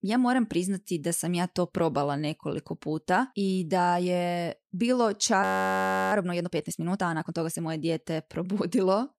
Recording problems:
audio freezing; at 5.5 s for 0.5 s

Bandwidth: 14.5 kHz